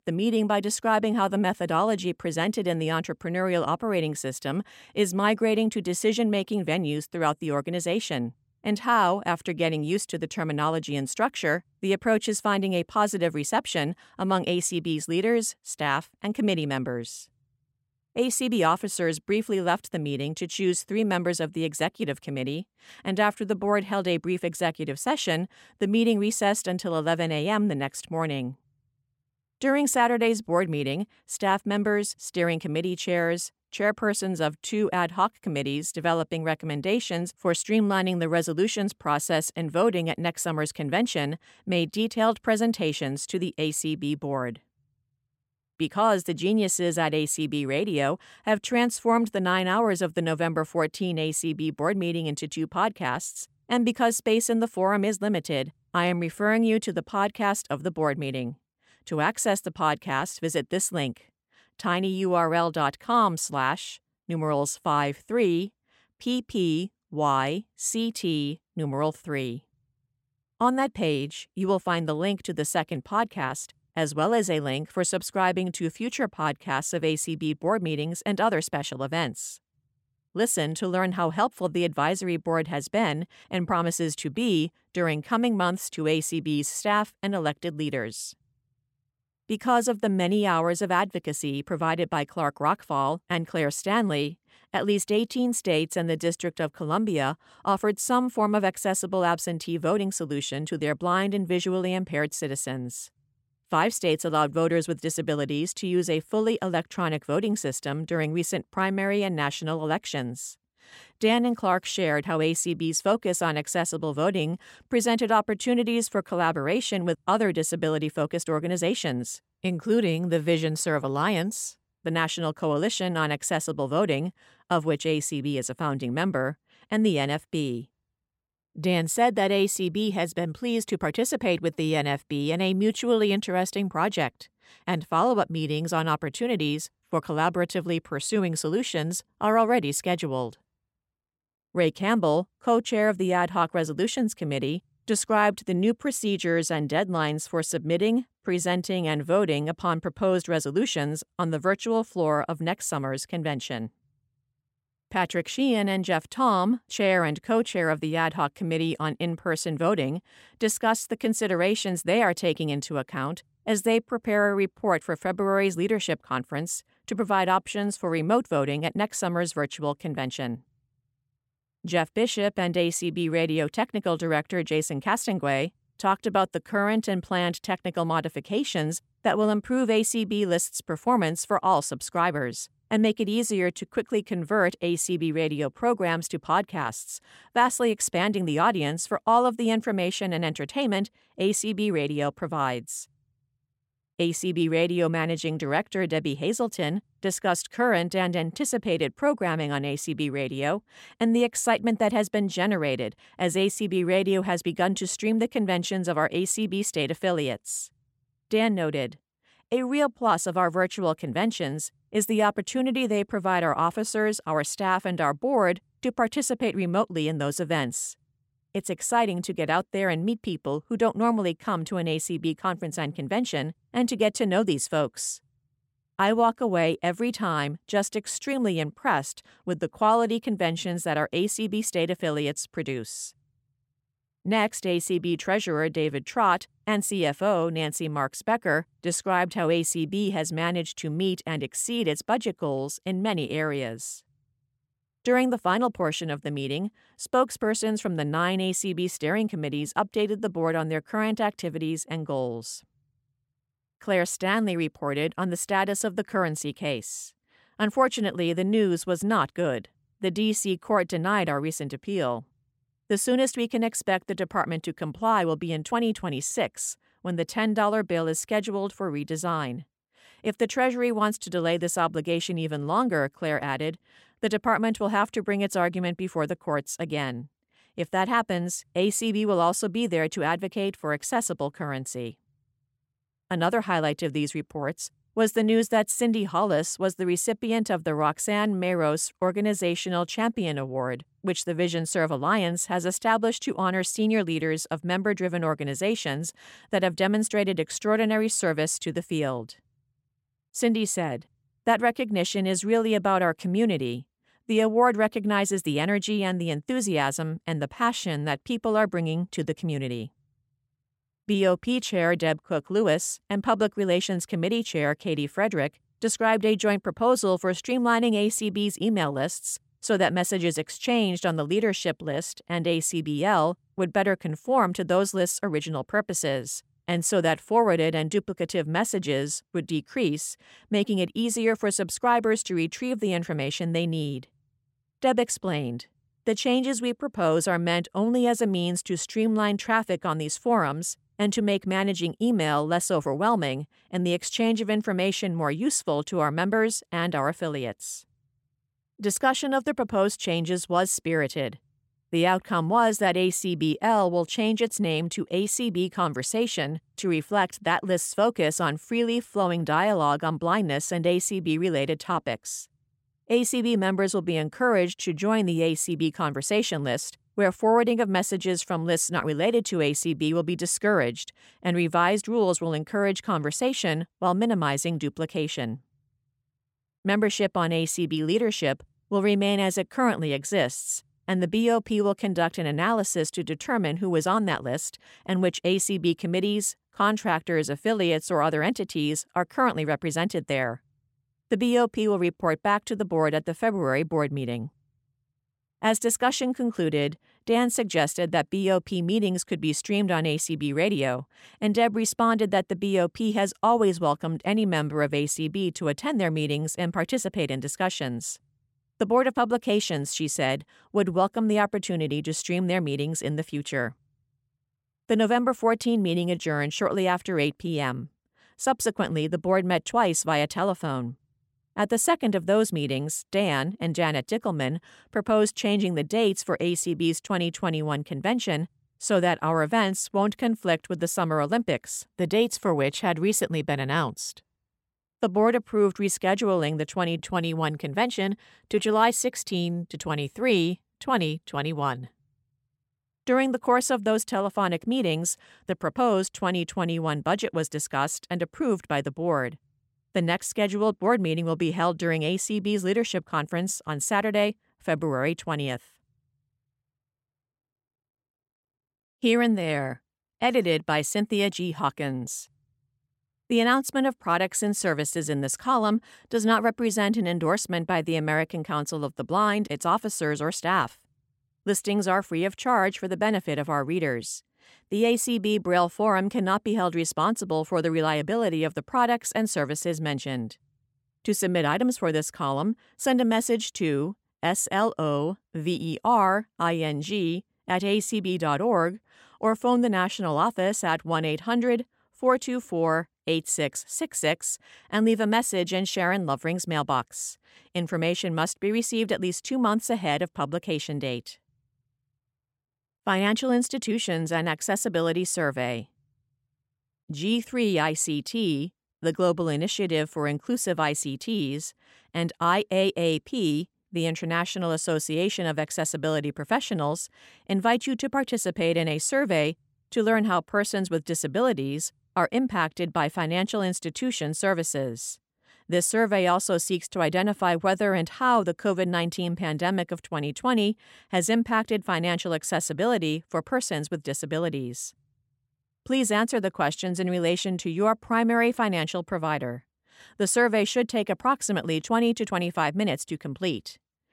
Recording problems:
none

